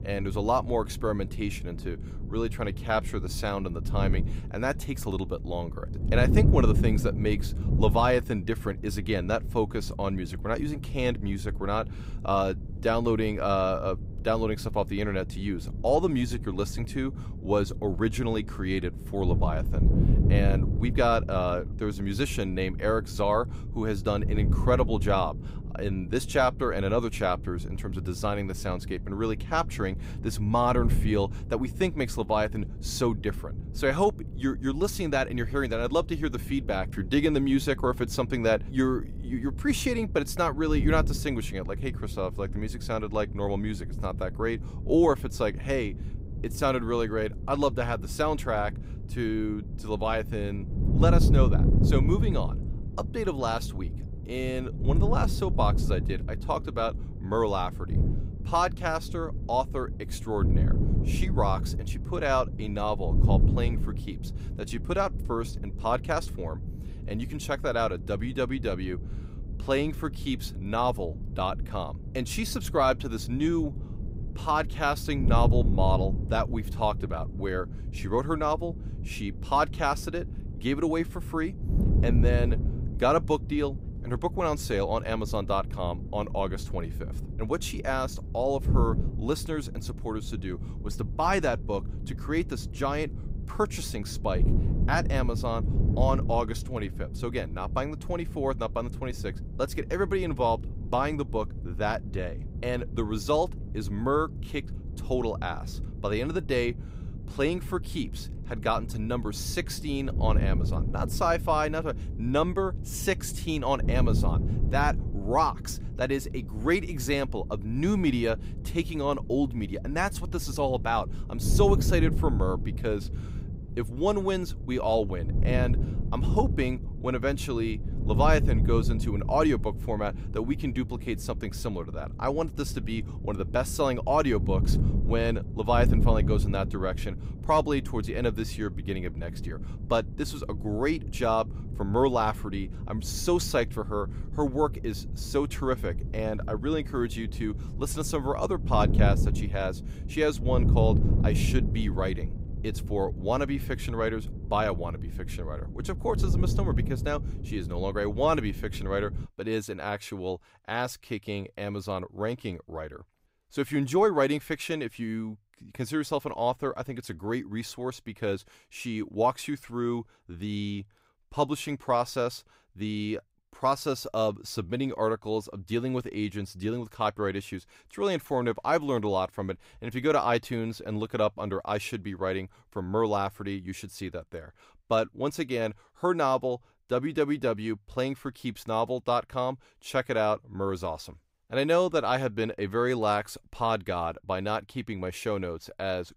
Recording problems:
wind noise on the microphone; occasional gusts; until 2:39; 15 dB below the speech

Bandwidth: 15.5 kHz